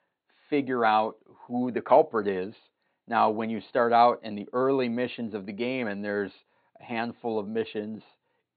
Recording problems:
high frequencies cut off; severe; nothing above 4.5 kHz

